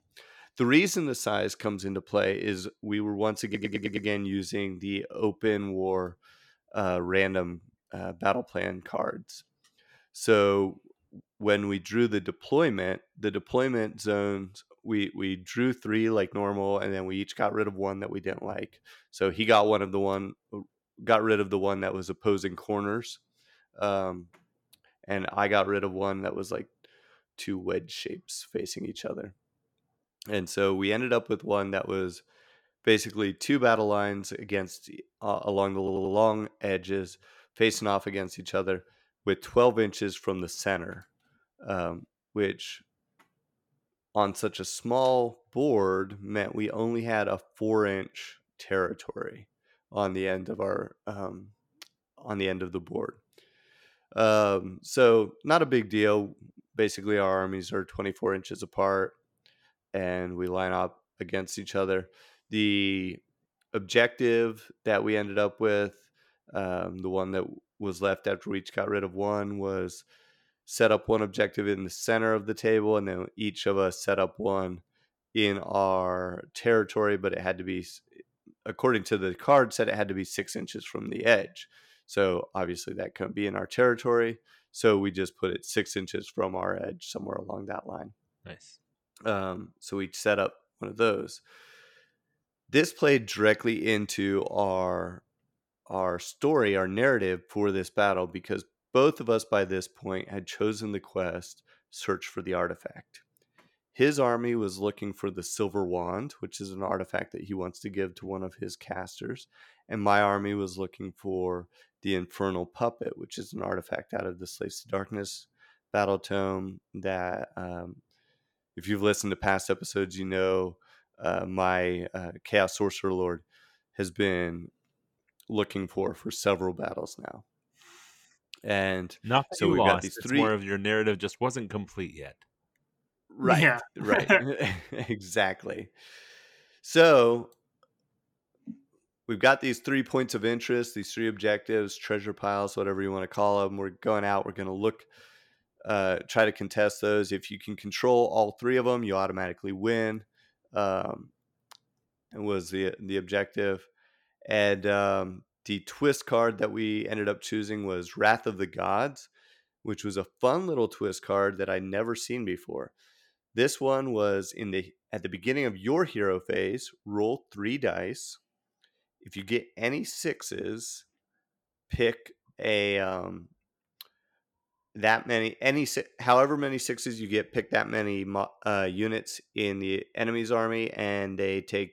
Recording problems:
audio stuttering; at 3.5 s and at 36 s

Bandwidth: 17 kHz